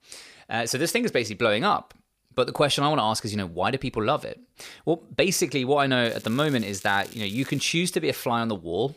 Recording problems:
crackling; faint; from 6 to 7.5 s; 20 dB below the speech

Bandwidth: 15 kHz